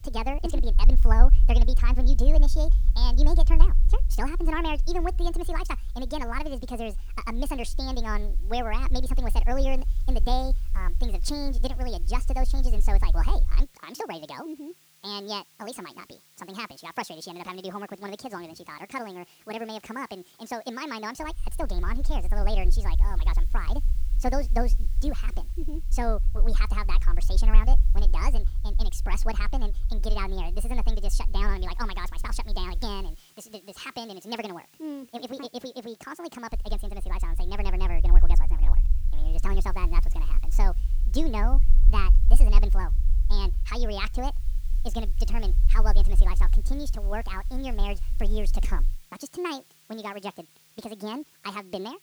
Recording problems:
wrong speed and pitch; too fast and too high; 1.7 times normal speed
low rumble; noticeable; until 14 s, from 21 to 33 s and from 37 to 49 s; 15 dB below the speech
hiss; faint; throughout; 20 dB below the speech

